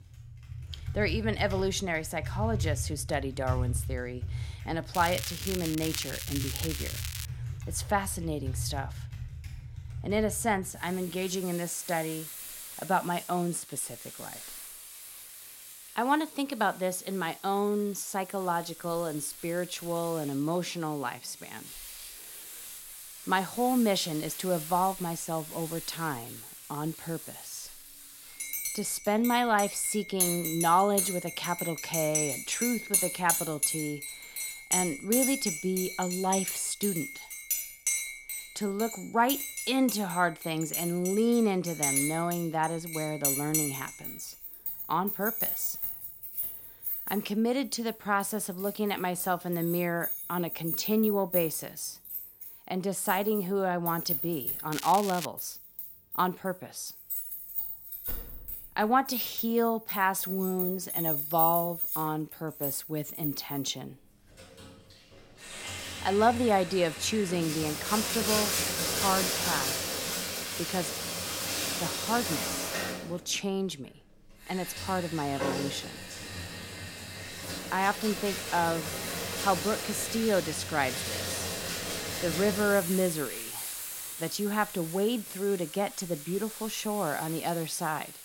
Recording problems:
household noises; loud; throughout; 3 dB below the speech
crackling; loud; from 5 to 7.5 s and at 55 s; 6 dB below the speech

